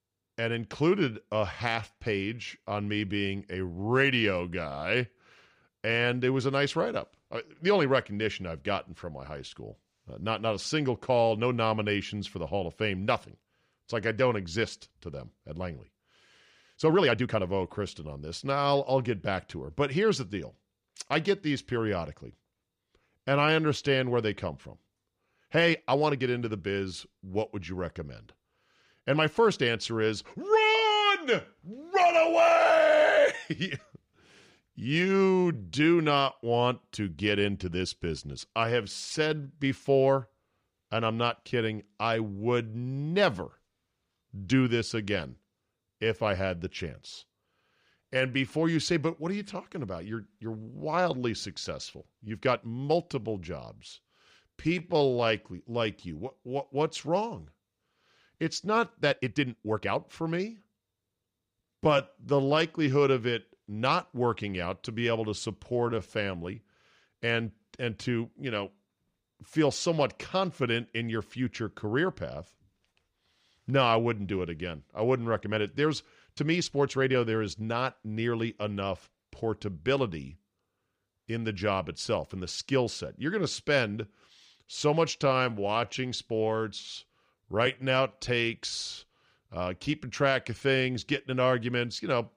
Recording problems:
uneven, jittery; strongly; from 1.5 s to 1:28

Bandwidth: 15 kHz